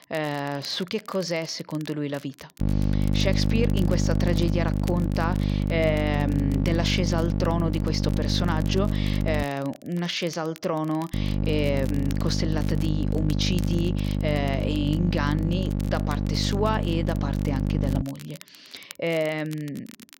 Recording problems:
electrical hum; loud; from 2.5 to 9.5 s and from 11 to 18 s; 50 Hz, 6 dB below the speech
crackle, like an old record; noticeable; 20 dB below the speech

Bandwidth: 16 kHz